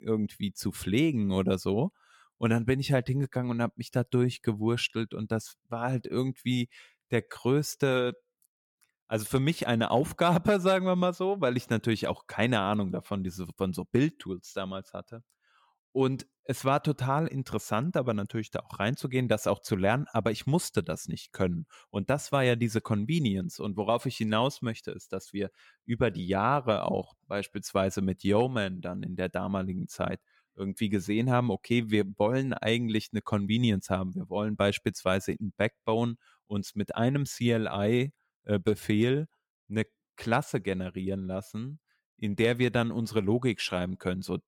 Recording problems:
none

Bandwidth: 17.5 kHz